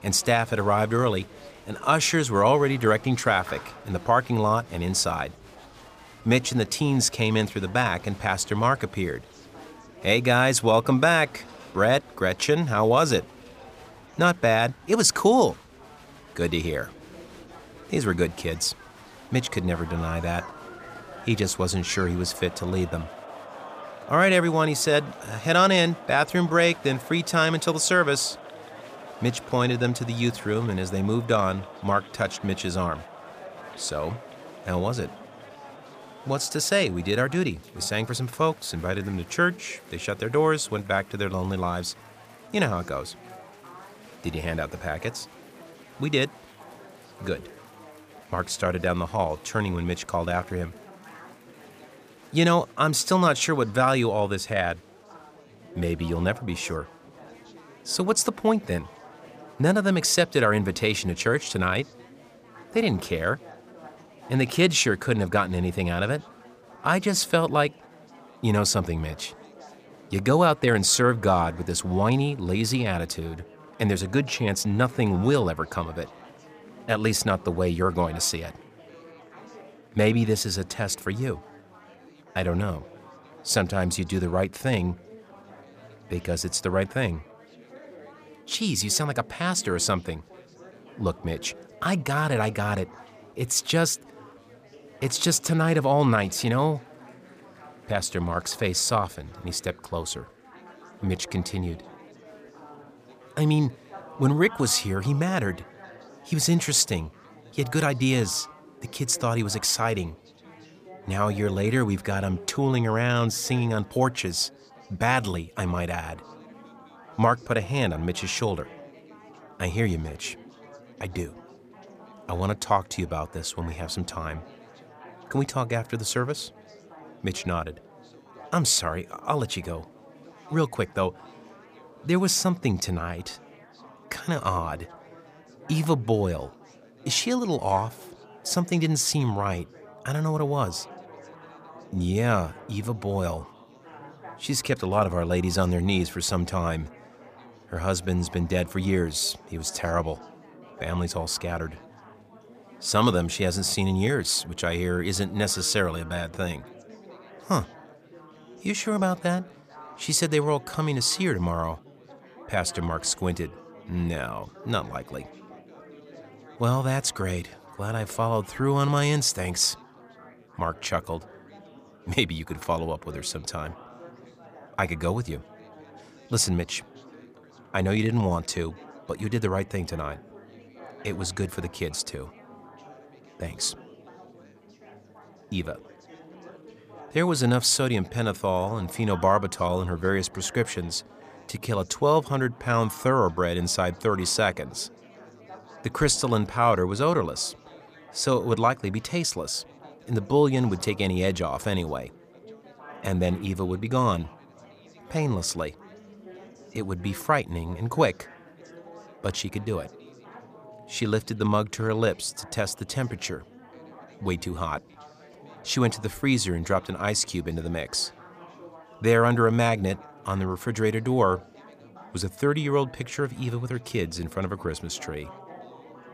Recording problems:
chatter from many people; faint; throughout; 20 dB below the speech

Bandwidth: 15 kHz